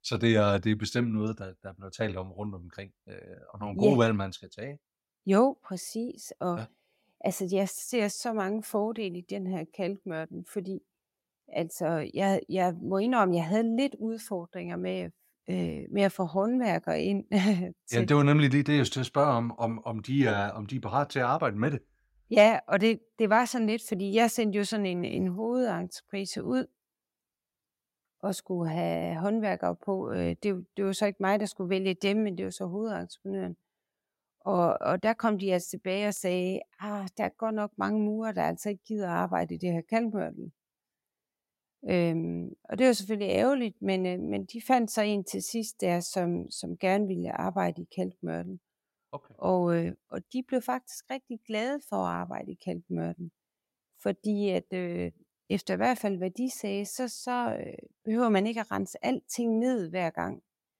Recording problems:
none

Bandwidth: 16 kHz